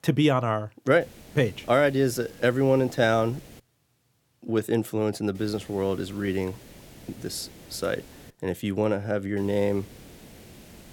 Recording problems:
hiss; faint; from 1 to 3.5 s, from 5.5 to 8.5 s and from 9.5 s on; 20 dB below the speech

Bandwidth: 17.5 kHz